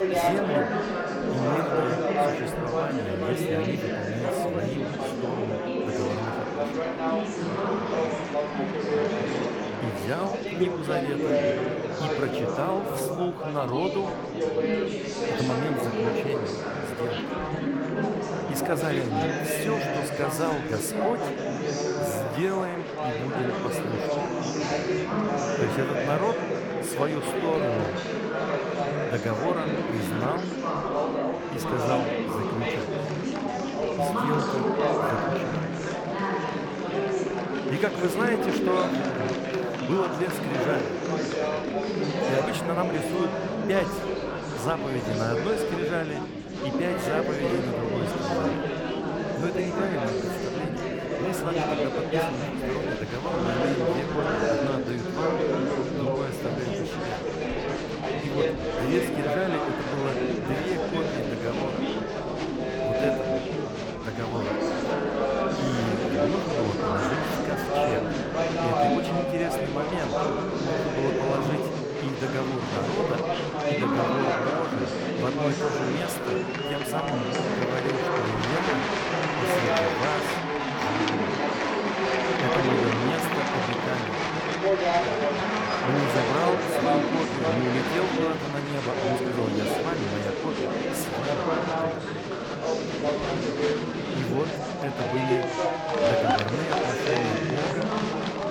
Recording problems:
murmuring crowd; very loud; throughout; 4 dB above the speech

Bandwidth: 18.5 kHz